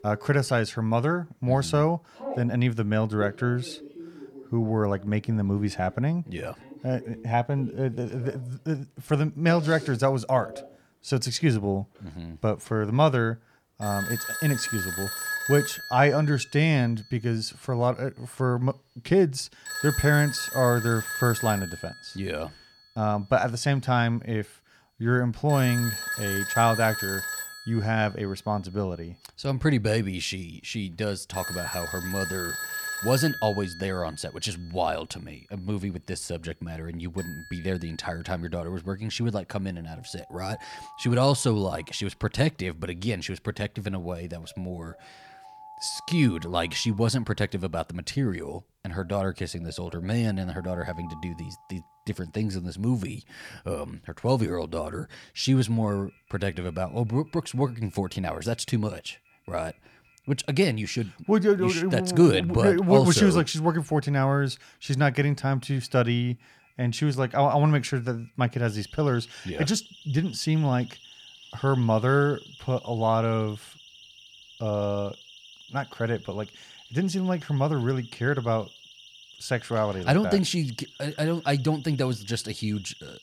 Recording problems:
alarms or sirens; noticeable; throughout; 10 dB below the speech

